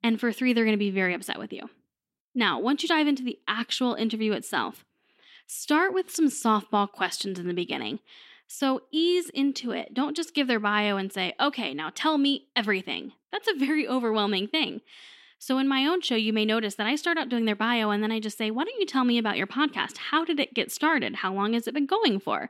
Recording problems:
none

